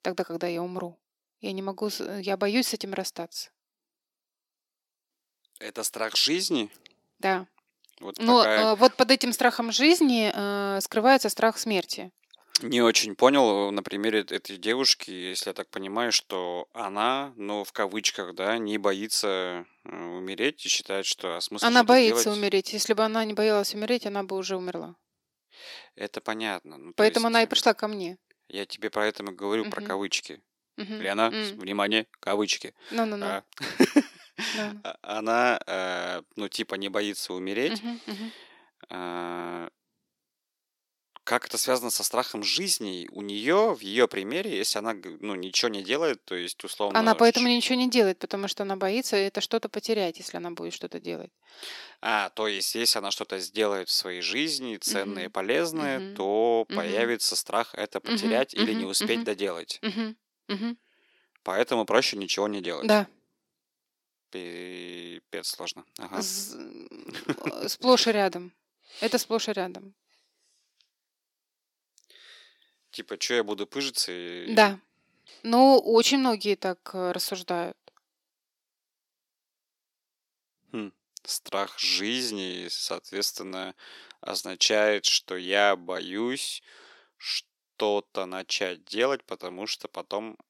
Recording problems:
thin; somewhat; fading below 350 Hz

